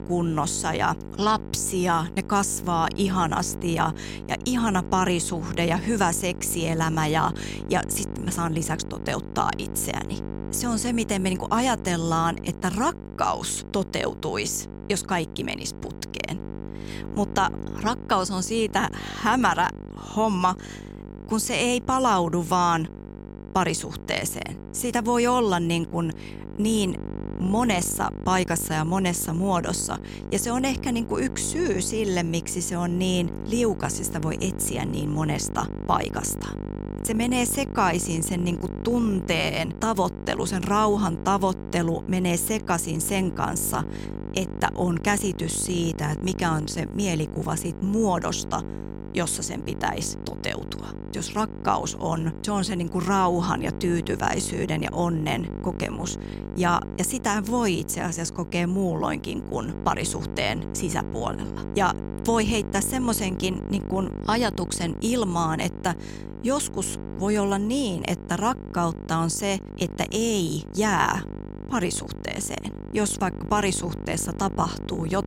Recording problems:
electrical hum; noticeable; throughout; 50 Hz, 15 dB below the speech

